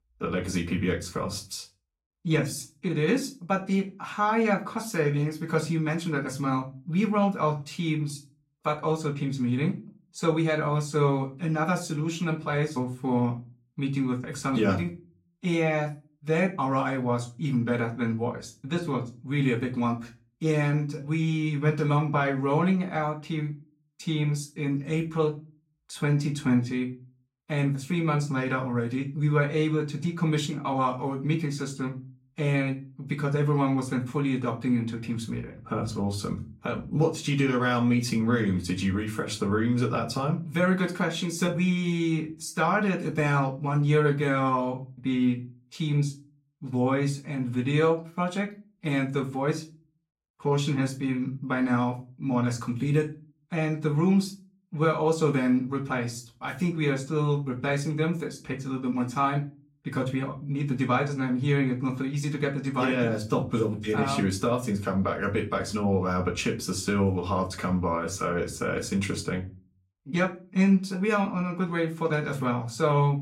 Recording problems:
off-mic speech; far
room echo; very slight; dies away in 0.3 s

